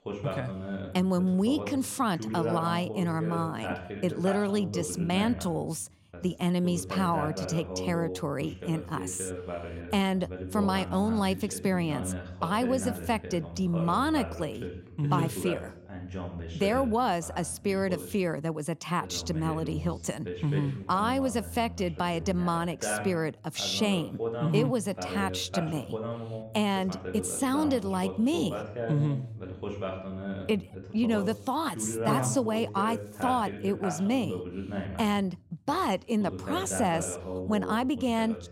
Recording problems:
voice in the background; loud; throughout; 8 dB below the speech

